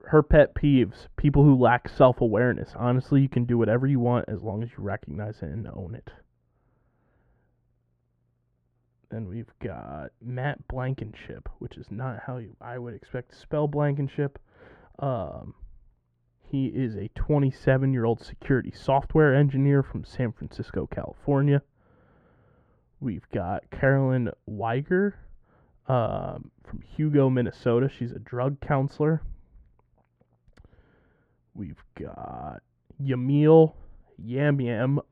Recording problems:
muffled; very; fading above 3 kHz

